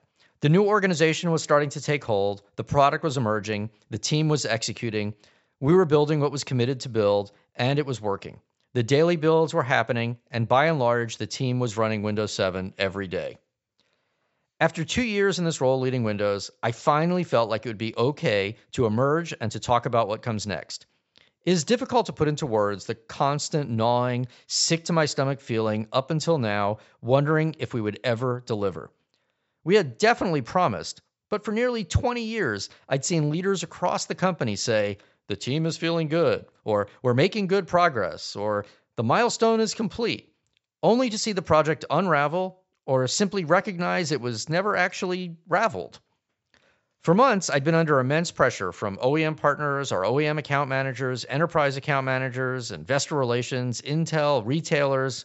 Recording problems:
high frequencies cut off; noticeable; nothing above 7.5 kHz

